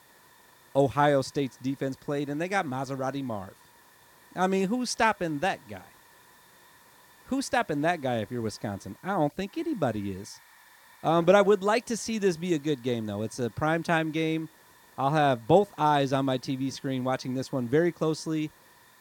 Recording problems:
hiss; faint; throughout; 25 dB below the speech

